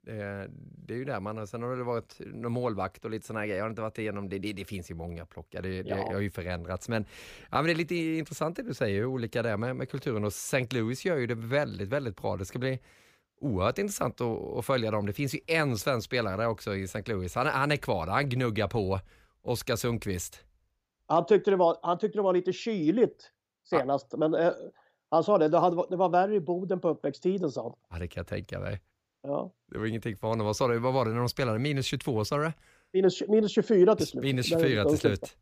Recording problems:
none

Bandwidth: 15 kHz